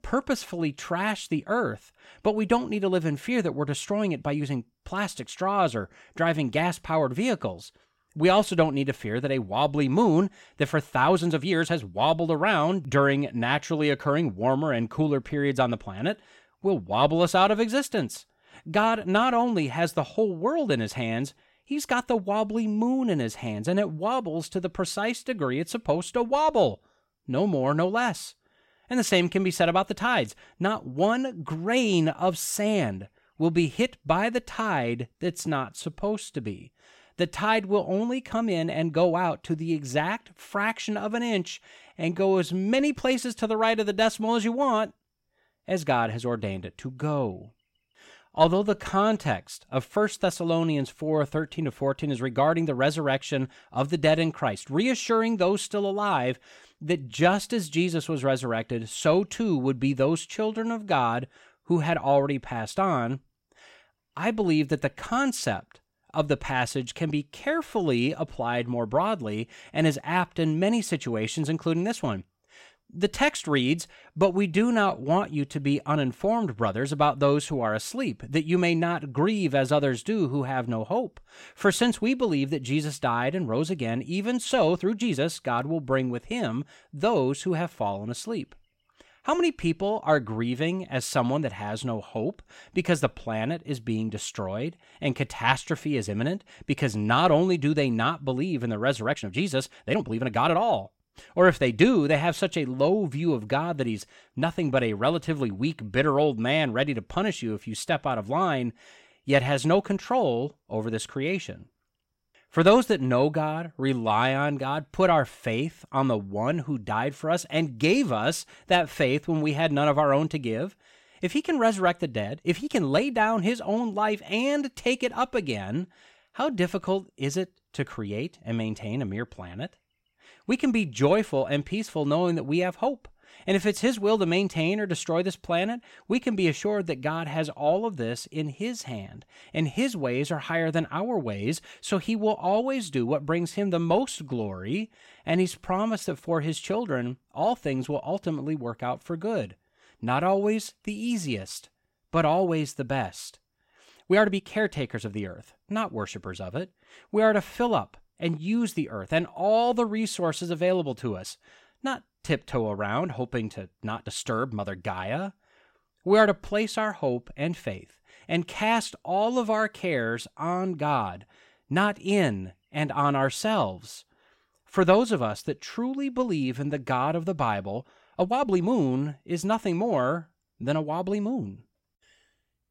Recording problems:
uneven, jittery; strongly; from 11 s to 3:01

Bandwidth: 16 kHz